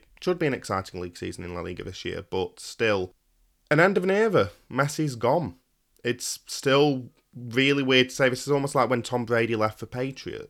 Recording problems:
none

